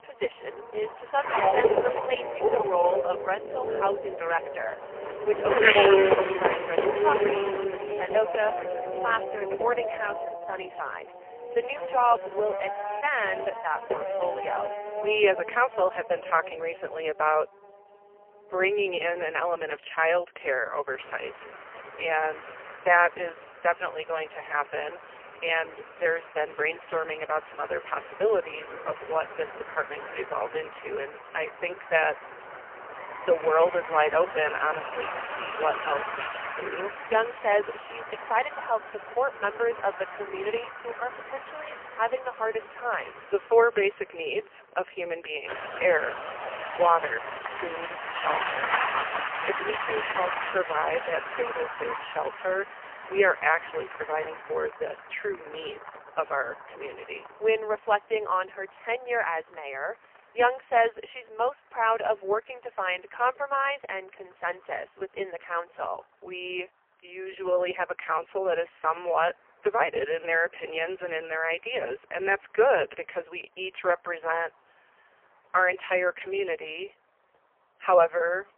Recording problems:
phone-call audio; poor line; nothing above 3 kHz
traffic noise; loud; throughout; 2 dB below the speech

